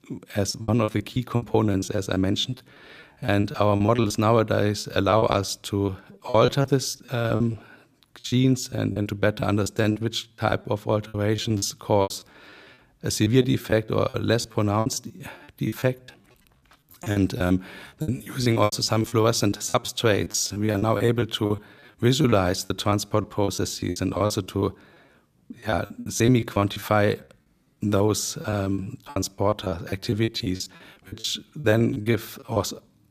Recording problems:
choppy; very; 18% of the speech affected

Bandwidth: 14.5 kHz